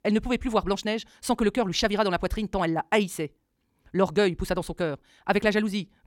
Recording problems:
wrong speed, natural pitch; too fast; 1.8 times normal speed

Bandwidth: 17 kHz